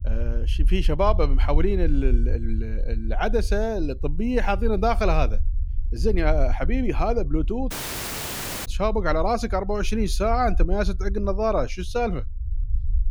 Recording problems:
low rumble; faint; throughout; 25 dB below the speech
audio cutting out; at 7.5 s for 1 s

